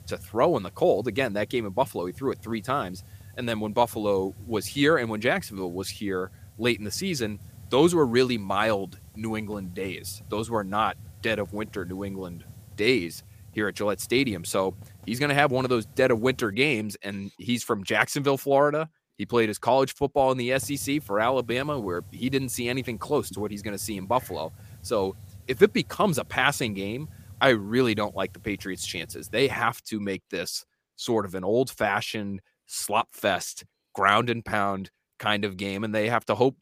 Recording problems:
hiss; faint; until 17 s and from 21 to 30 s; 20 dB below the speech

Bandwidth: 15 kHz